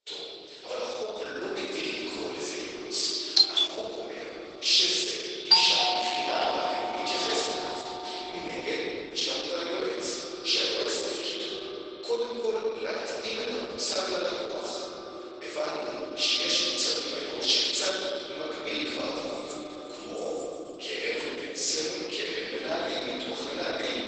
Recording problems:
room echo; strong; dies away in 3 s
off-mic speech; far
garbled, watery; badly; nothing above 8 kHz
thin; very; fading below 400 Hz
echo of what is said; noticeable; throughout; 130 ms later, 15 dB below the speech
doorbell; loud; at 3.5 s and from 5.5 to 6.5 s; peak 9 dB above the speech
jangling keys; faint; from 19 to 21 s; peak 15 dB below the speech

